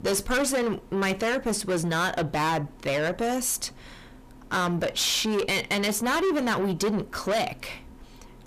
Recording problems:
distortion; heavy; 6 dB below the speech

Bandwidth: 14.5 kHz